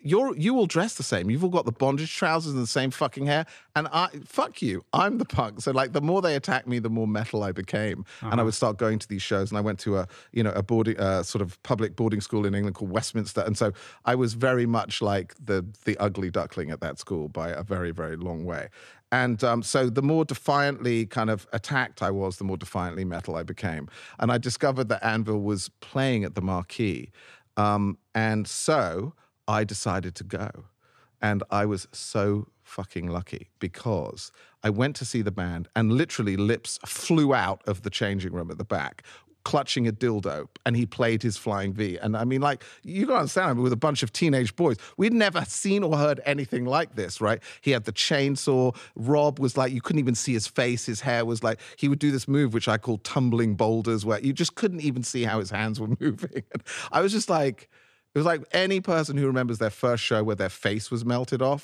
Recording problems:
none

